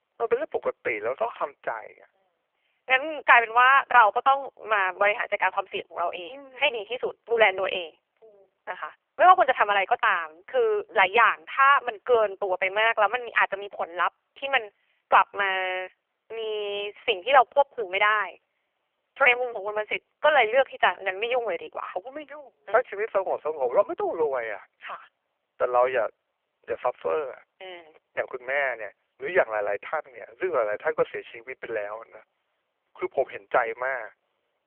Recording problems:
phone-call audio; poor line; nothing above 3 kHz
thin; very; fading below 350 Hz

